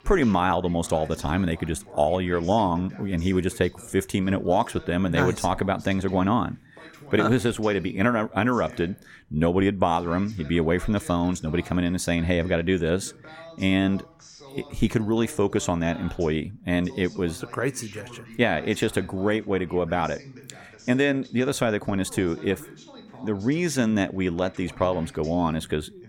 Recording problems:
voice in the background; faint; throughout; 20 dB below the speech

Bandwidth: 17.5 kHz